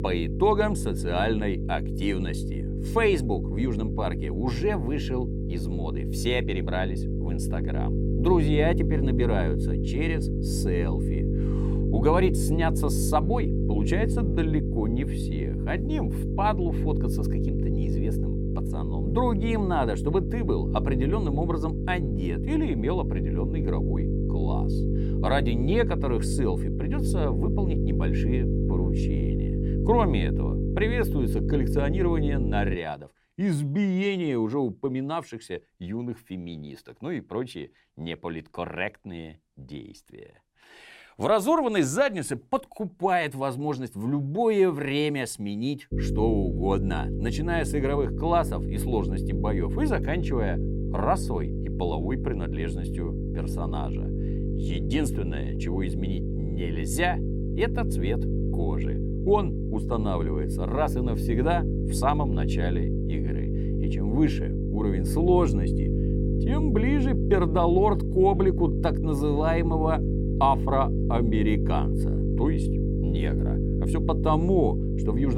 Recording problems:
electrical hum; loud; until 33 s and from 46 s on; 50 Hz, 7 dB below the speech
abrupt cut into speech; at the end

